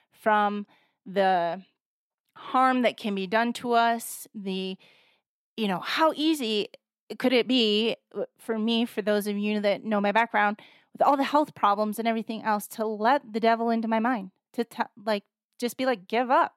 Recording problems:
none

